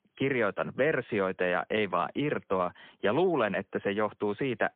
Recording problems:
phone-call audio; poor line

